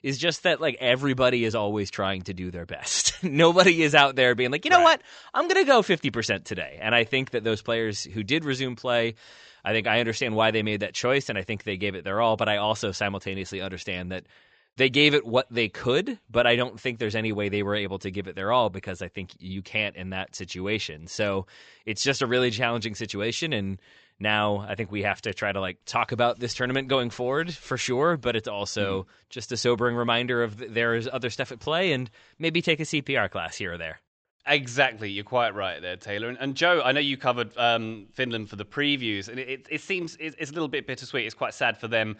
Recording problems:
high frequencies cut off; noticeable; nothing above 8 kHz

